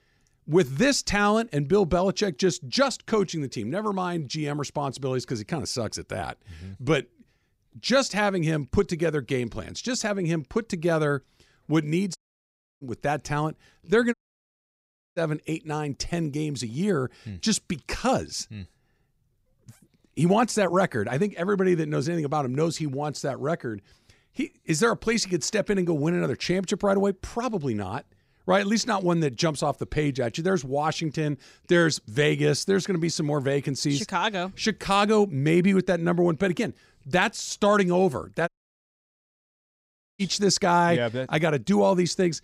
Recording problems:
audio cutting out; at 12 s for 0.5 s, at 14 s for 1 s and at 38 s for 1.5 s

